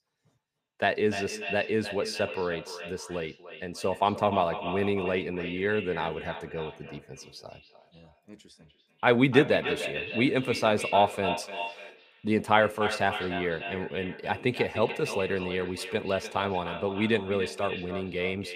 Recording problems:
echo of what is said; strong; throughout; 300 ms later, 8 dB below the speech

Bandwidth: 15 kHz